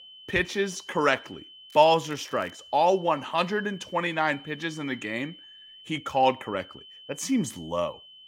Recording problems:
high-pitched whine; noticeable; throughout; 3 kHz, 20 dB below the speech
crackling; faint; at 1.5 s; 30 dB below the speech

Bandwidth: 16 kHz